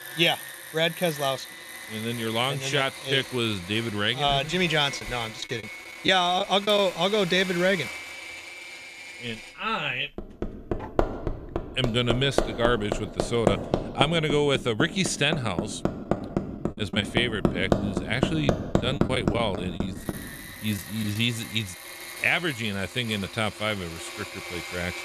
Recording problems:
machinery noise; loud; throughout; 7 dB below the speech
choppy; very; from 5 to 7 s and from 19 to 21 s; 10% of the speech affected

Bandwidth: 14.5 kHz